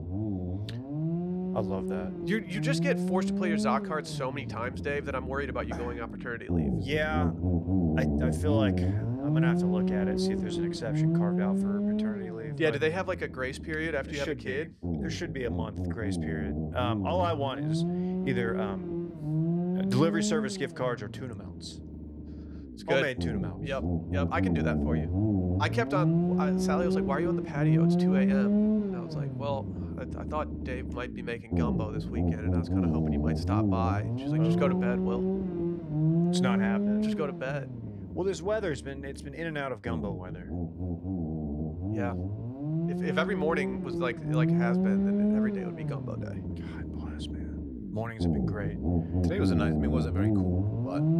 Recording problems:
low rumble; loud; throughout; 2 dB below the speech

